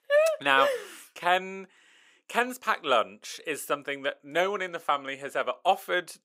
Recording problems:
thin; somewhat; fading below 450 Hz

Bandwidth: 15.5 kHz